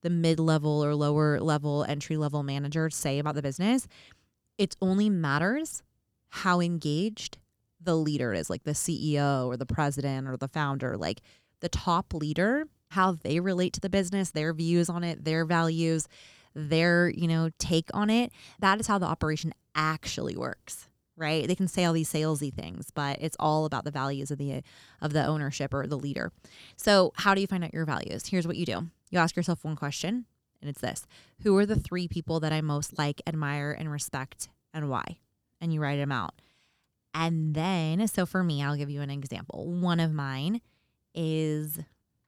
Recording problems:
none

